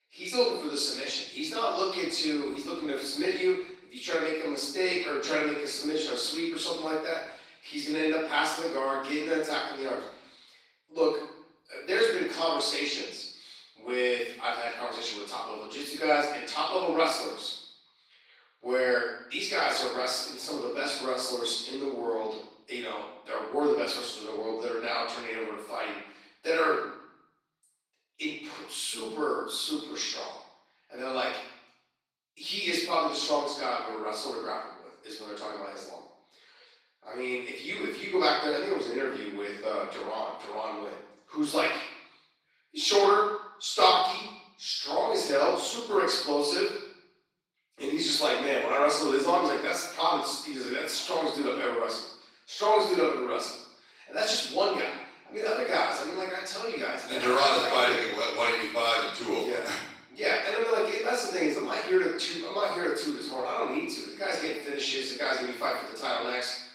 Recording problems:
off-mic speech; far
room echo; noticeable; dies away in 0.7 s
garbled, watery; slightly; nothing above 16.5 kHz
thin; very slightly; fading below 300 Hz

